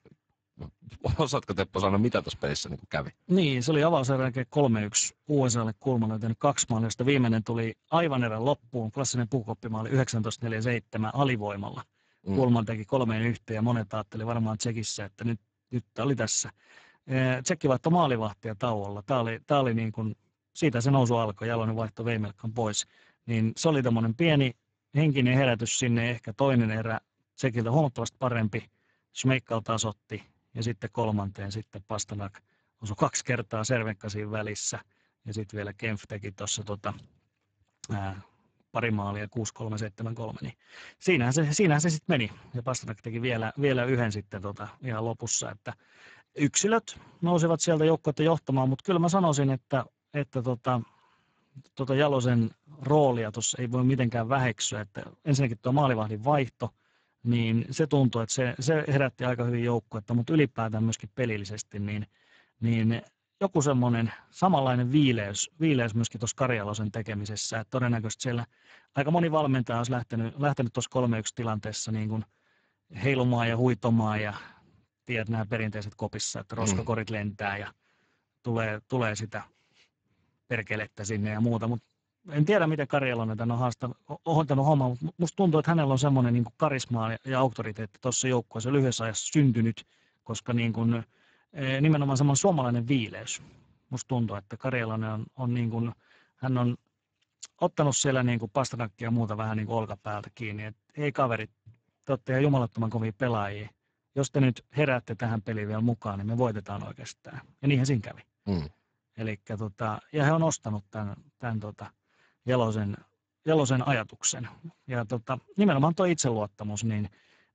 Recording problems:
garbled, watery; badly; nothing above 7.5 kHz

